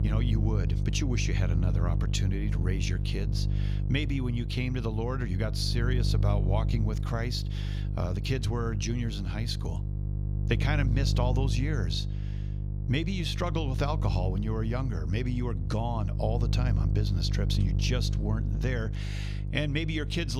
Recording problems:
electrical hum; loud; throughout; 50 Hz, 9 dB below the speech
abrupt cut into speech; at the end

